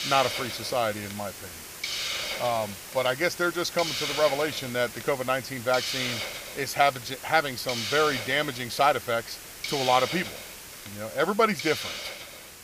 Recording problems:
hiss; loud; throughout; 6 dB below the speech

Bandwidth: 15 kHz